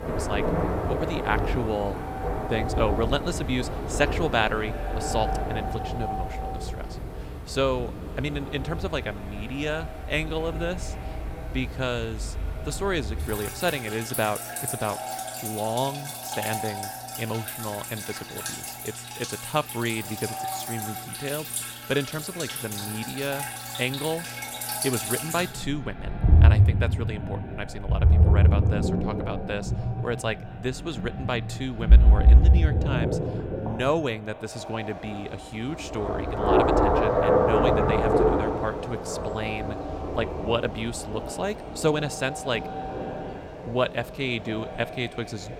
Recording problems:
echo of what is said; strong; throughout; 210 ms later, 10 dB below the speech
rain or running water; very loud; throughout; 4 dB above the speech

